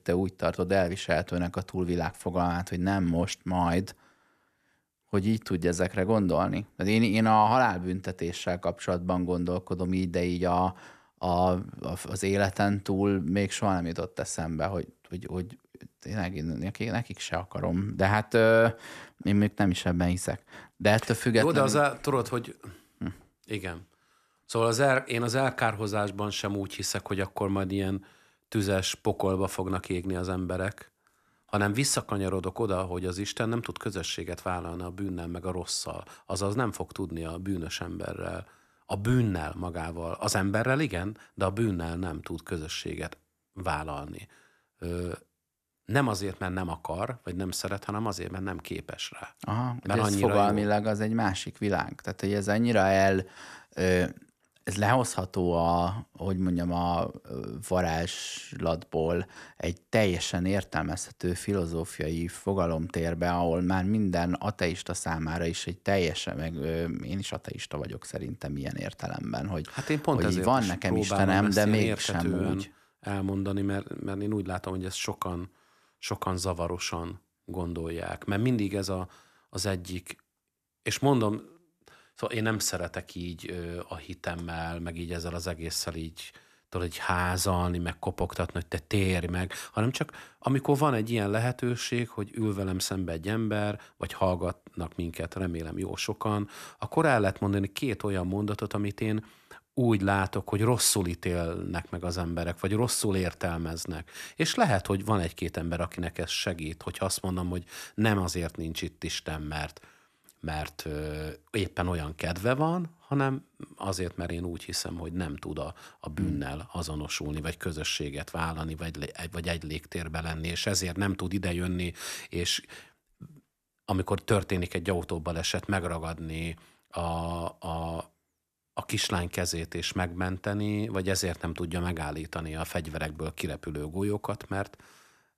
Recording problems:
none

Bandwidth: 14 kHz